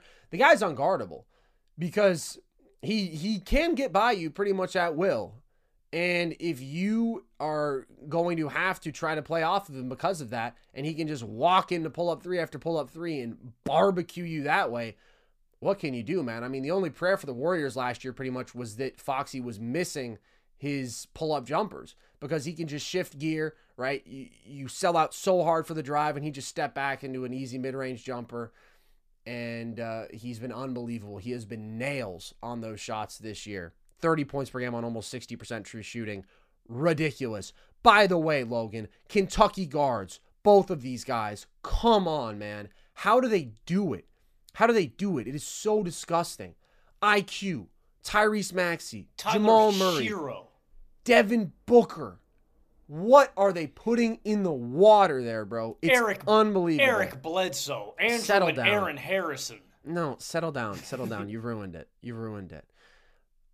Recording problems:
none

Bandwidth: 15 kHz